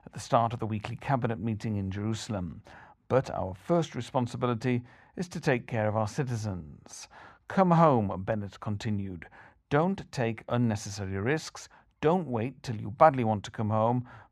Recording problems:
muffled; very; fading above 2.5 kHz

